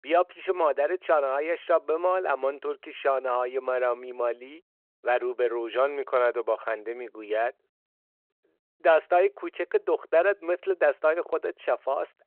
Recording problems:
phone-call audio

